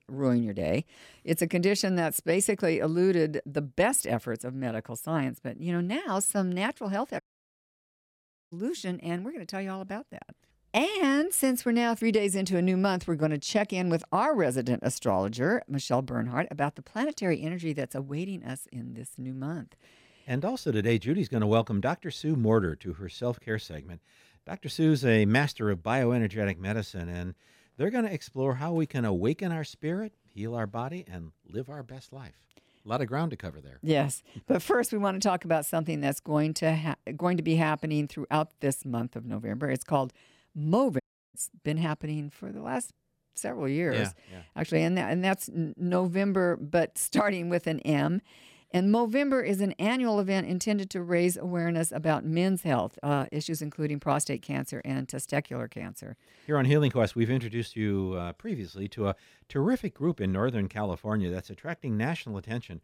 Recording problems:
audio cutting out; at 7 s for 1.5 s and at 41 s

